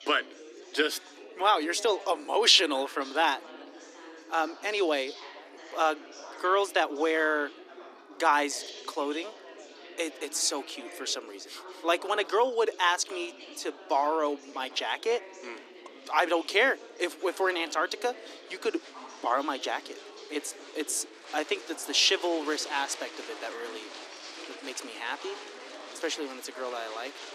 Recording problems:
thin; somewhat; fading below 300 Hz
chatter from many people; noticeable; throughout; 15 dB below the speech

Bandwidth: 14 kHz